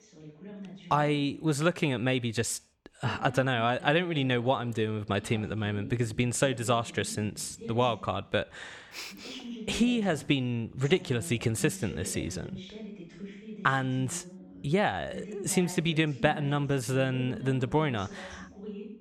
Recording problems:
voice in the background; noticeable; throughout; 15 dB below the speech

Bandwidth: 17 kHz